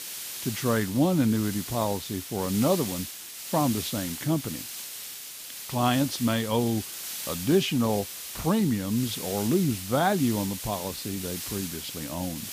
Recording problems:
hiss; loud; throughout; 7 dB below the speech

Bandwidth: 15 kHz